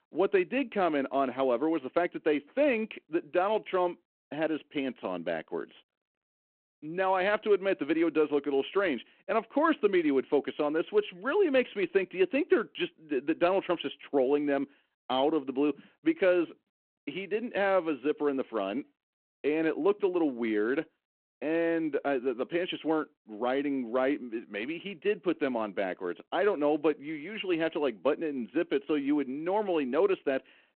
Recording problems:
phone-call audio

